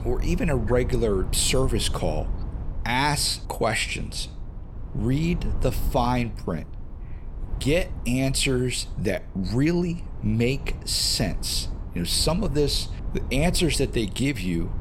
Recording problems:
low rumble; noticeable; throughout; 20 dB below the speech

